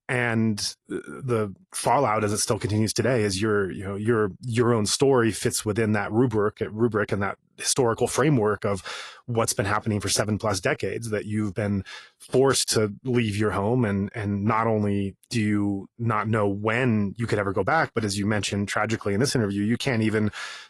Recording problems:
garbled, watery; slightly; nothing above 11.5 kHz

